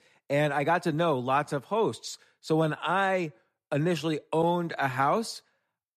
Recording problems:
none

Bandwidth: 13.5 kHz